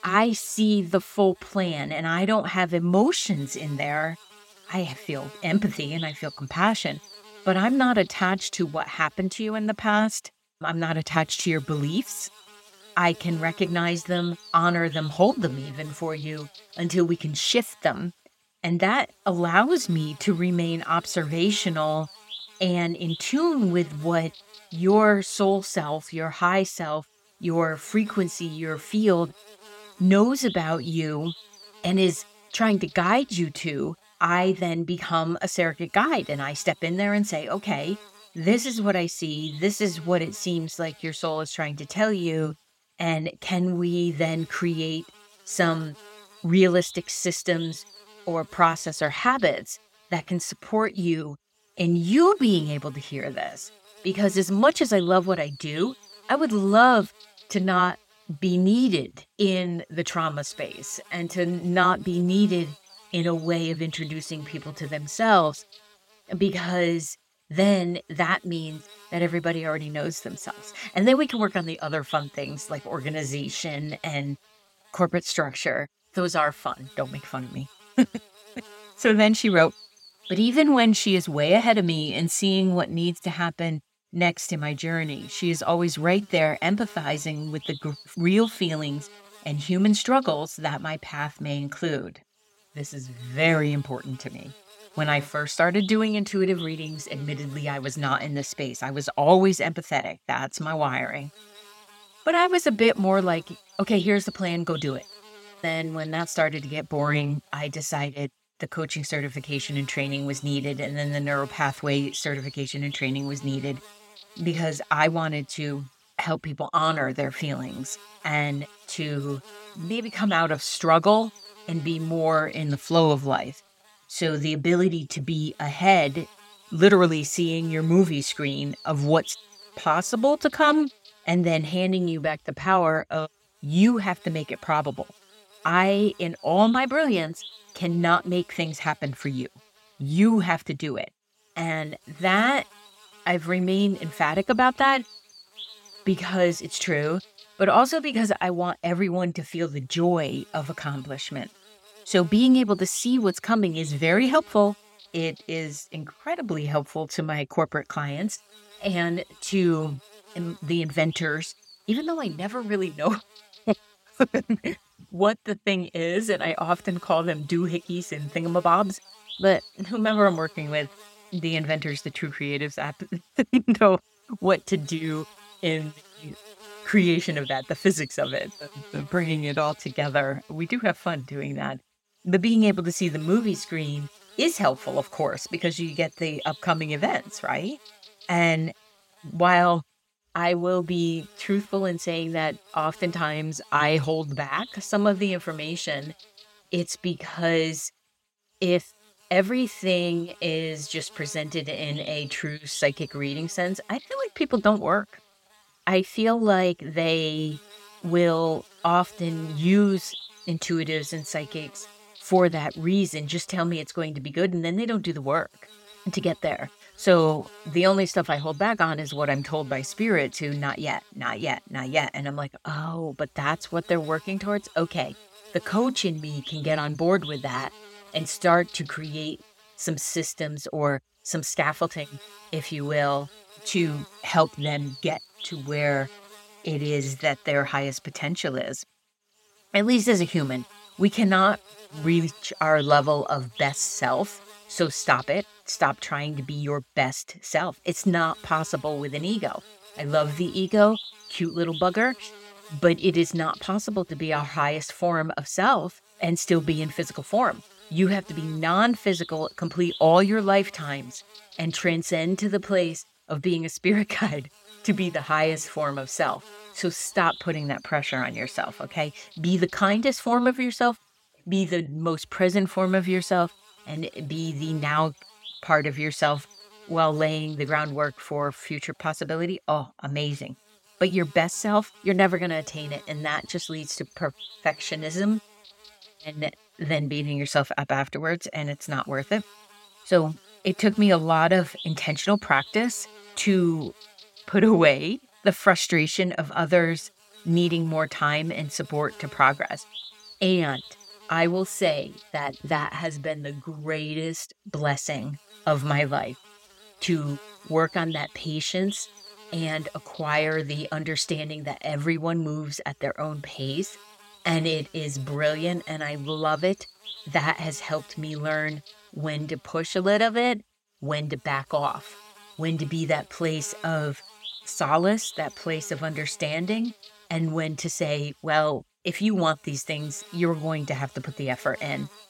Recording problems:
electrical hum; noticeable; throughout; 60 Hz, 20 dB below the speech

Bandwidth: 16.5 kHz